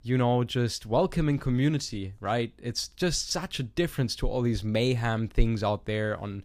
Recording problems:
none

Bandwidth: 15 kHz